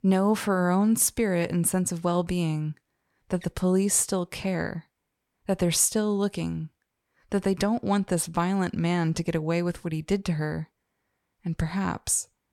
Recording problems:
none

